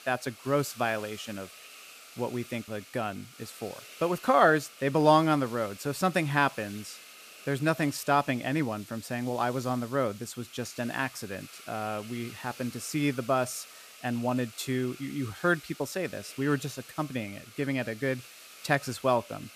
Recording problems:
hiss; noticeable; throughout; 15 dB below the speech

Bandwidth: 14.5 kHz